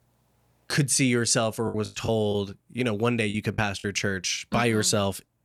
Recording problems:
choppy; very; from 1.5 to 4 s; 9% of the speech affected

